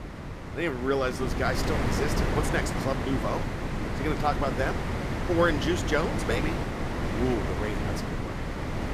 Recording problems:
wind noise on the microphone; heavy; 3 dB below the speech

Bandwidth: 14.5 kHz